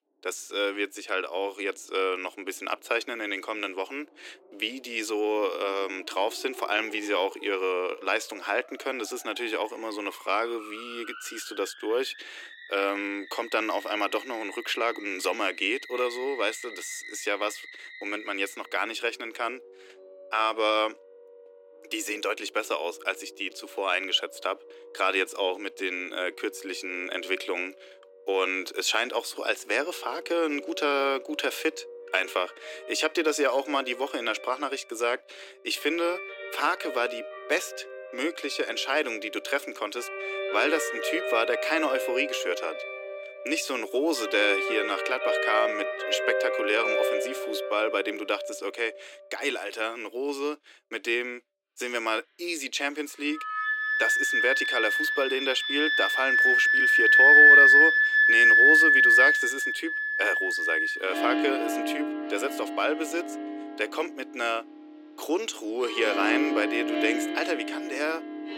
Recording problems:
thin; somewhat; fading below 300 Hz
background music; very loud; throughout; 7 dB above the speech

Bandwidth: 16.5 kHz